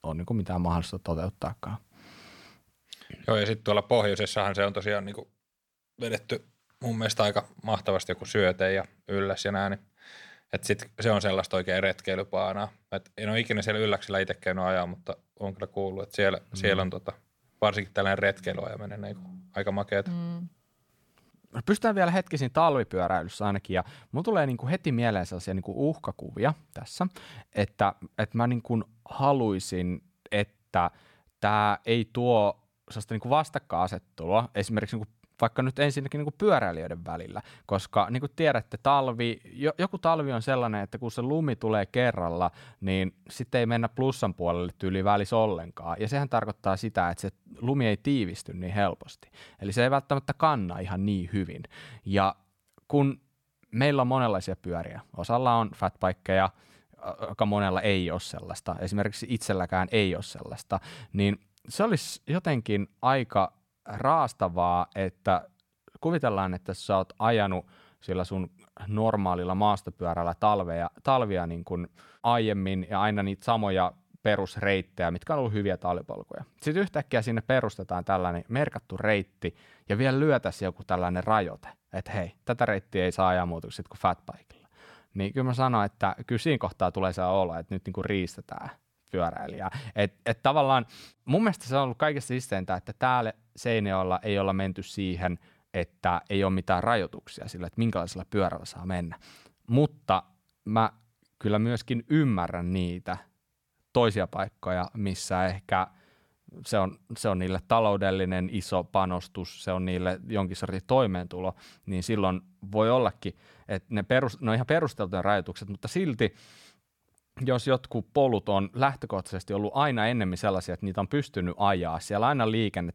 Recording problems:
none

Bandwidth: 18 kHz